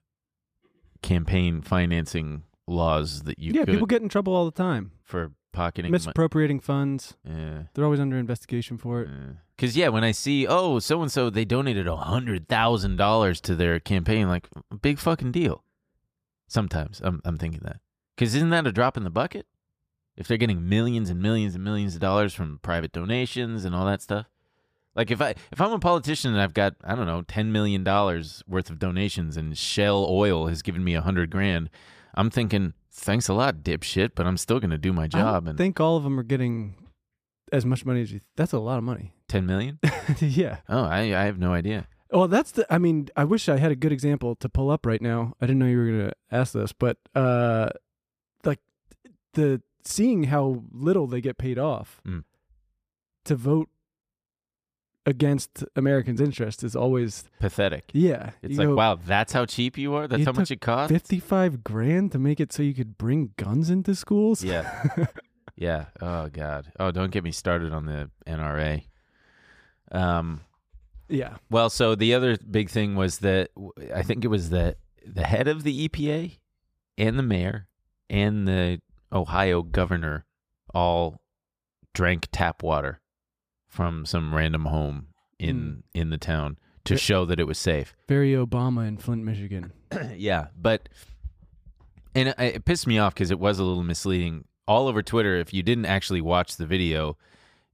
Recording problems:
none

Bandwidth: 15 kHz